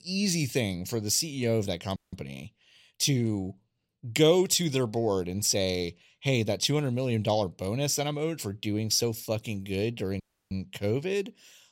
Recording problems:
audio cutting out; at 2 s and at 10 s

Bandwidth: 16 kHz